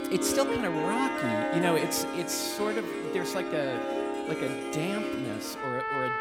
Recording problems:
echo of what is said; noticeable; throughout; 150 ms later, 15 dB below the speech
background music; very loud; throughout; as loud as the speech

